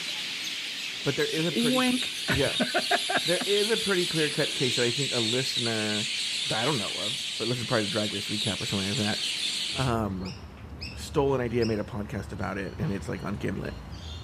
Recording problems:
animal sounds; very loud; throughout; 1 dB above the speech

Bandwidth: 14.5 kHz